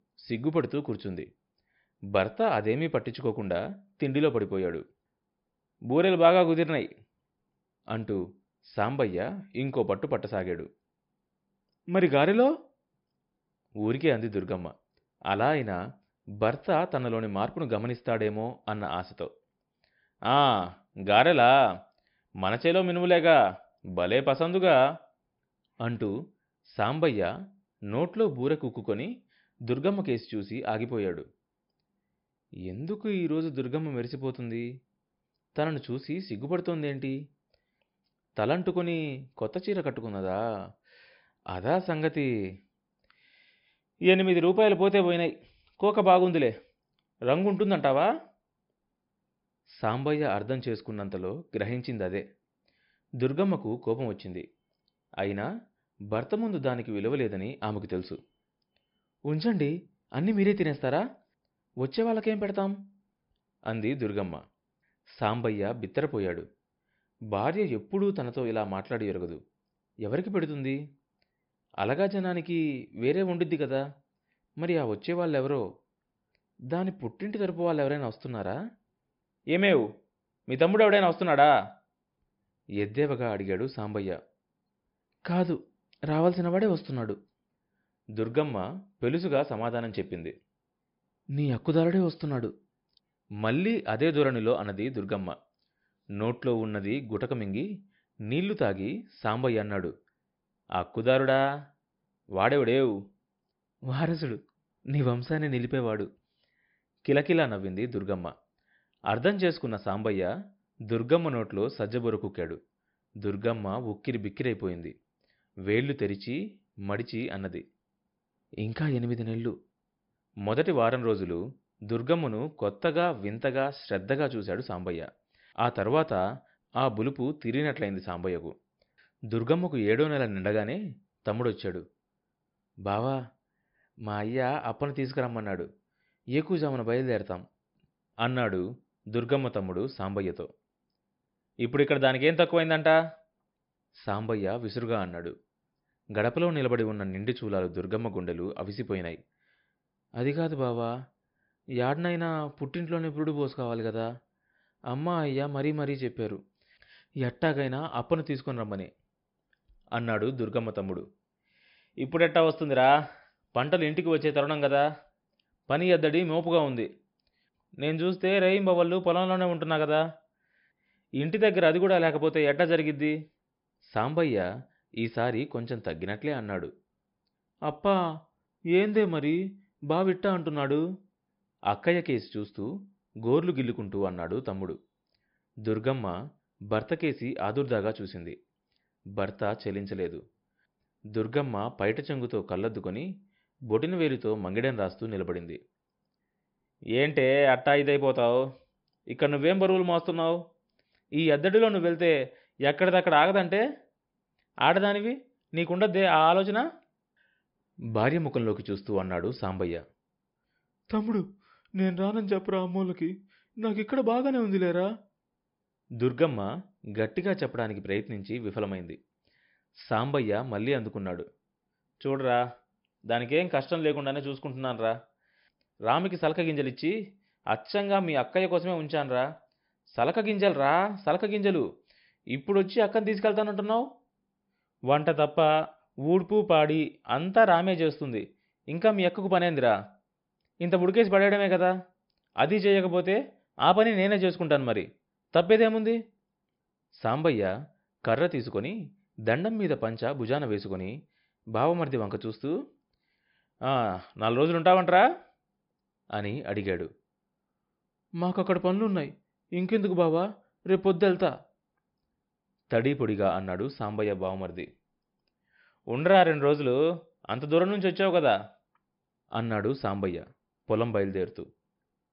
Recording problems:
high frequencies cut off; noticeable; nothing above 5.5 kHz

